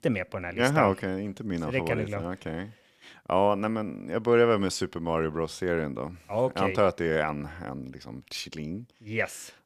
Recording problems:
none

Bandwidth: 15 kHz